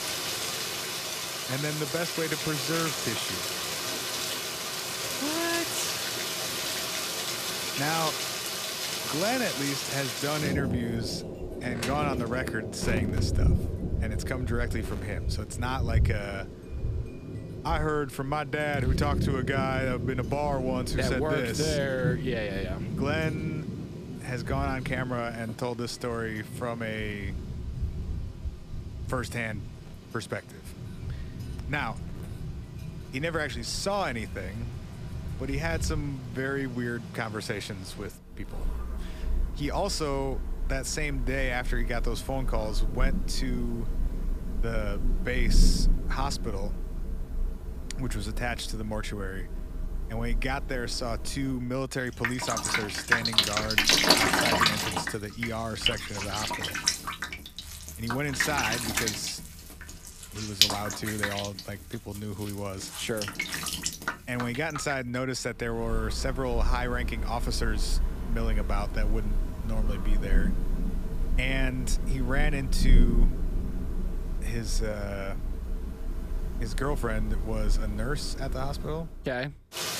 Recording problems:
rain or running water; very loud; throughout; 1 dB above the speech

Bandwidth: 14.5 kHz